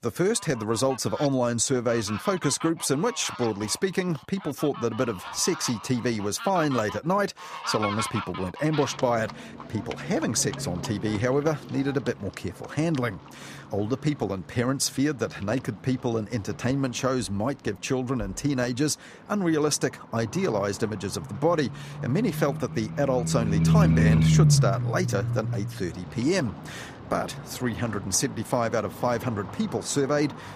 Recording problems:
animal sounds; loud; throughout; 3 dB below the speech

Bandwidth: 14.5 kHz